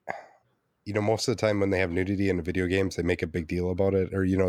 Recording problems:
abrupt cut into speech; at the end

